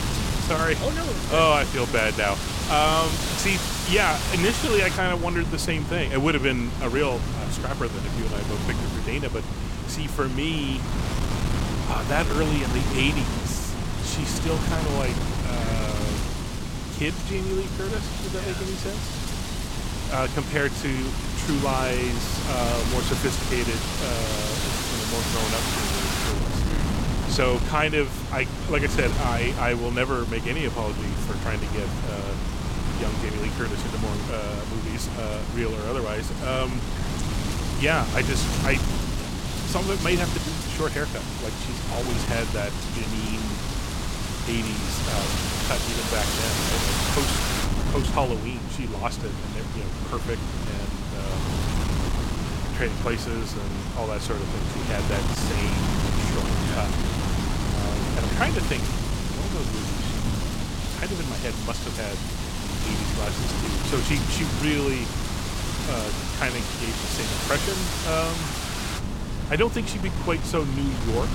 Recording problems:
wind noise on the microphone; heavy; 3 dB below the speech

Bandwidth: 16.5 kHz